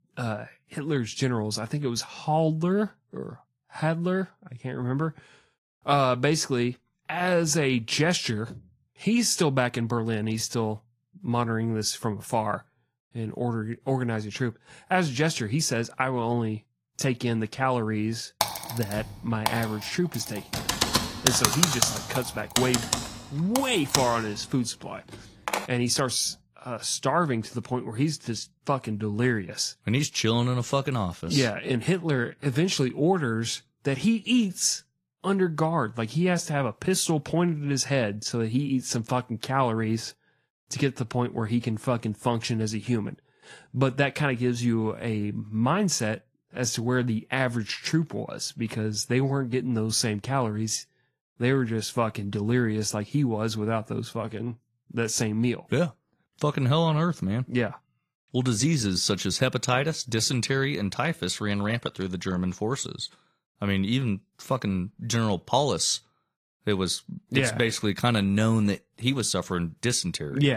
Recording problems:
garbled, watery; slightly
keyboard typing; loud; from 18 to 26 s; peak 6 dB above the speech
abrupt cut into speech; at the end

